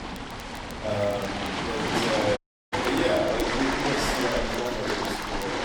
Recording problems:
off-mic speech; far
room echo; noticeable; dies away in 0.8 s
rain or running water; very loud; throughout; 1 dB above the speech
crackle, like an old record; noticeable; 20 dB below the speech
low rumble; faint; throughout; 20 dB below the speech
audio cutting out; at 2.5 s

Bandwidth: 17.5 kHz